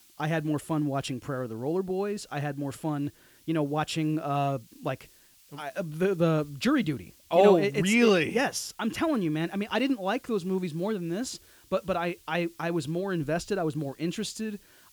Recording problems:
hiss; faint; throughout; 30 dB below the speech

